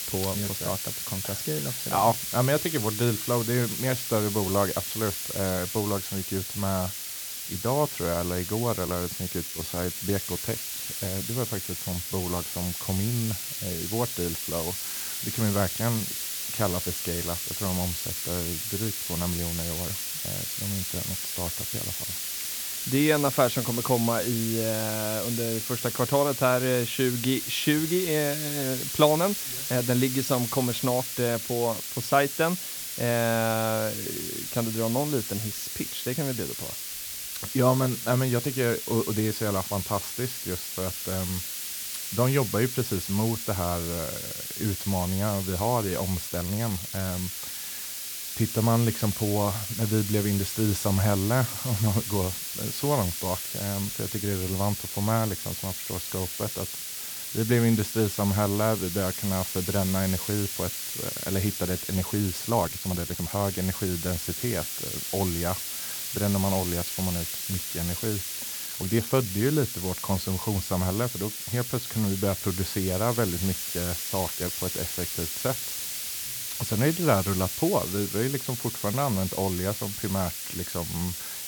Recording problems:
hiss; loud; throughout; 2 dB below the speech
uneven, jittery; strongly; from 9 s to 1:14

